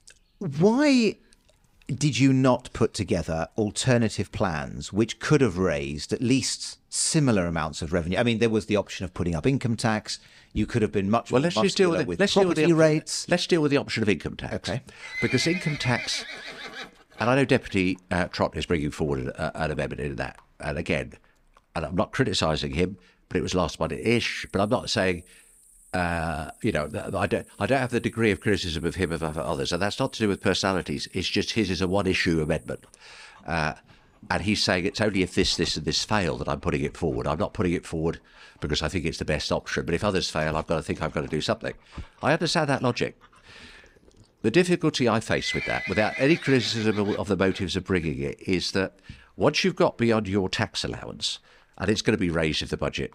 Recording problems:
animal sounds; noticeable; throughout; 15 dB below the speech

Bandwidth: 15.5 kHz